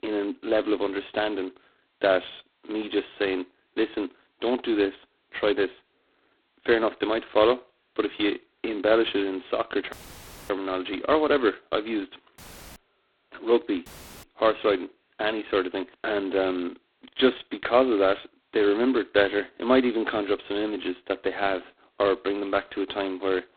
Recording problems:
phone-call audio; poor line; nothing above 4 kHz
audio cutting out; filled with static; at 10 s for 0.5 s, at 12 s and at 14 s

